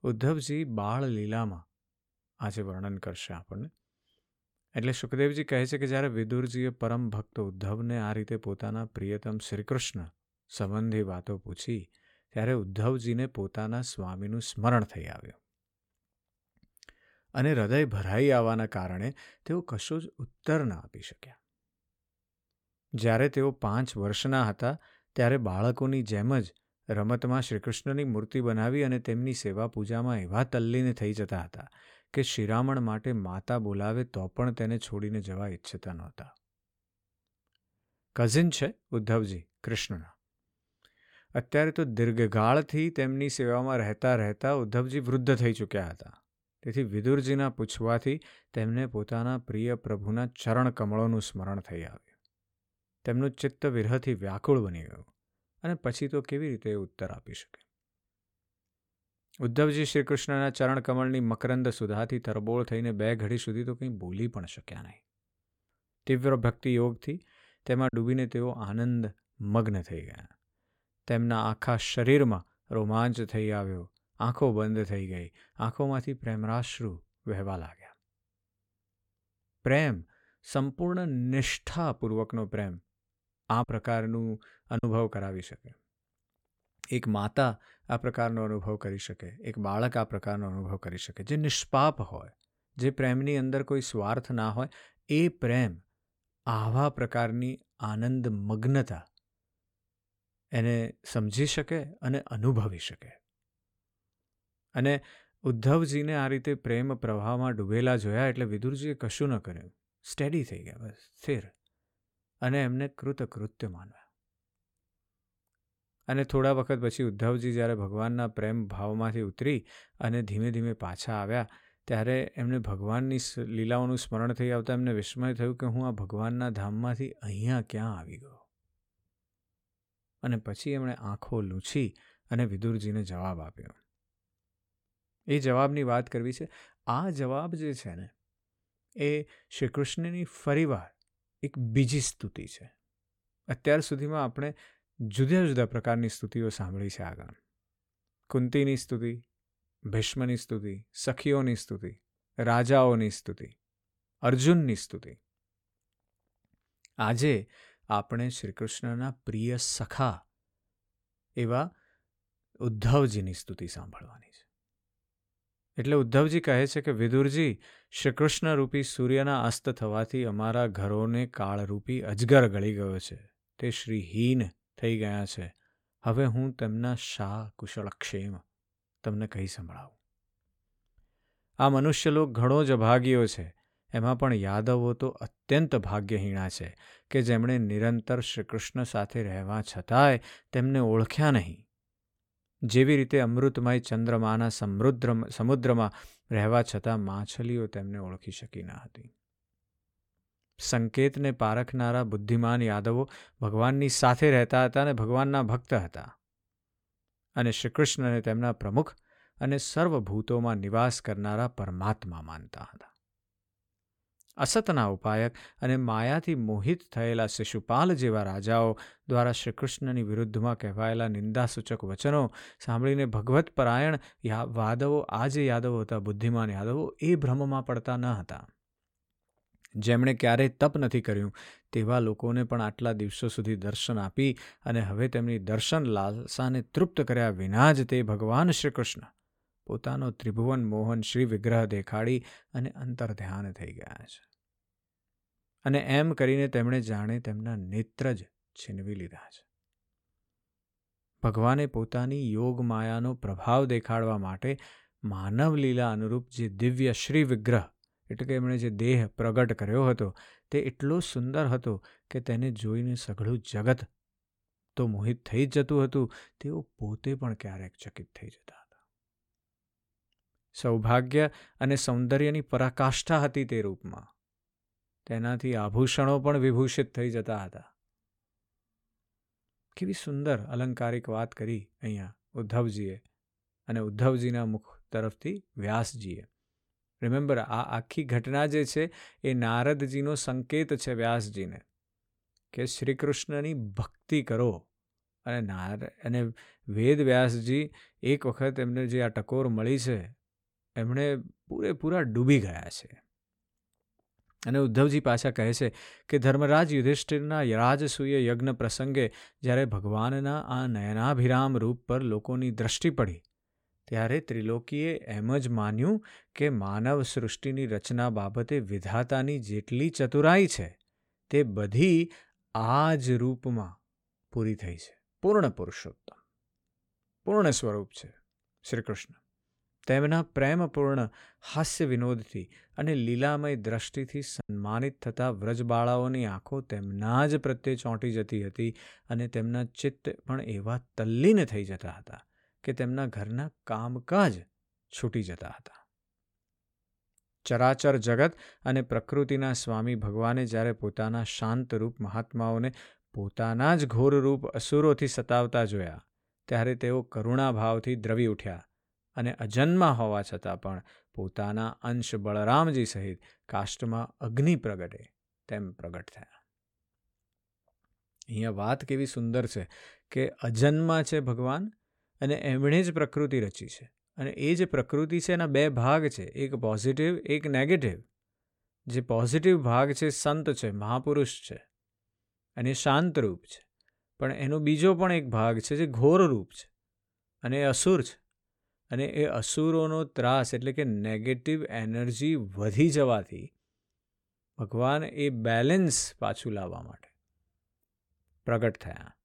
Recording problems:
choppy; occasionally; at 1:08, from 1:24 to 1:25 and at 5:34; 3% of the speech affected

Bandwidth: 17 kHz